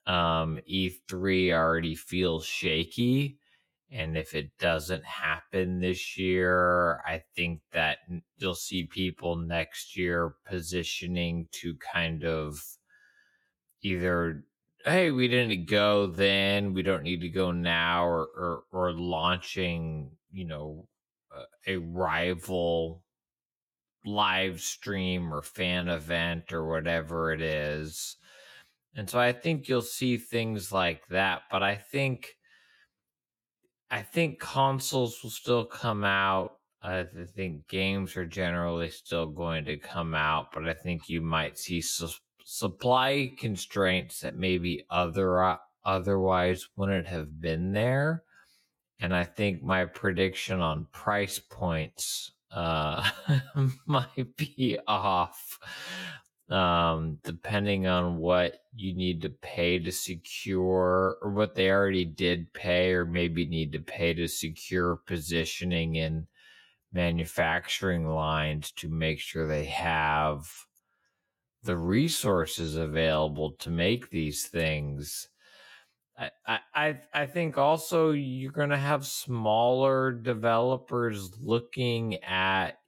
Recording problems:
wrong speed, natural pitch; too slow; 0.6 times normal speed

